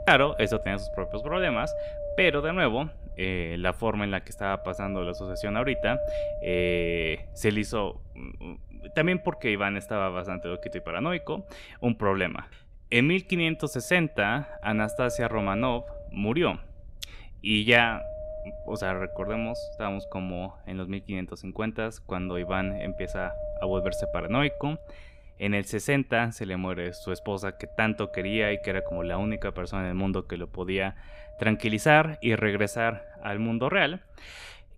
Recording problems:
wind noise on the microphone; heavy; 9 dB below the speech

